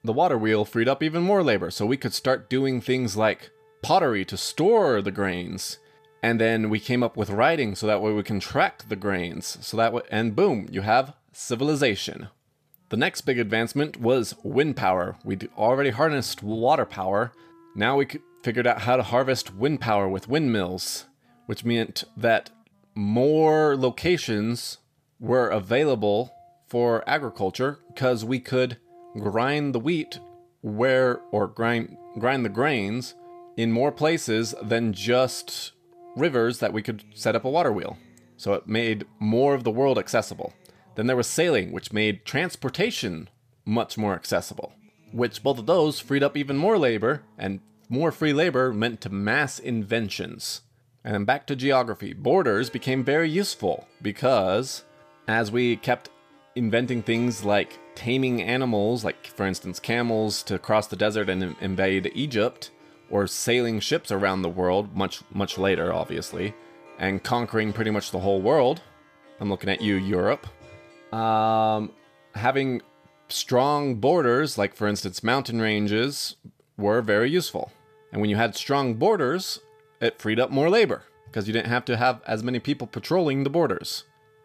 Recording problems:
background music; faint; throughout; 30 dB below the speech

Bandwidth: 14.5 kHz